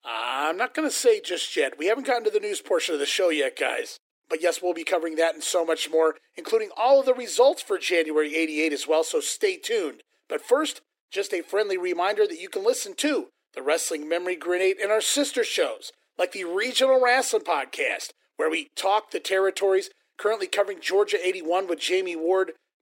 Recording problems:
thin; somewhat; fading below 300 Hz

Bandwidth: 16 kHz